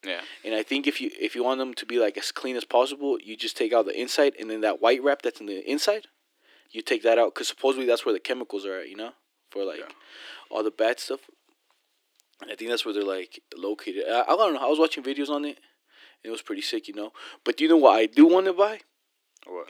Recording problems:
thin; somewhat; fading below 300 Hz

